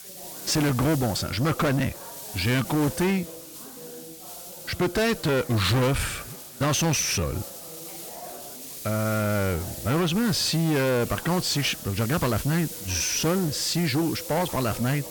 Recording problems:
distortion; heavy; 6 dB below the speech
hiss; noticeable; throughout; 10 dB below the speech
chatter from many people; faint; throughout; 20 dB below the speech
uneven, jittery; slightly; from 2.5 to 15 s

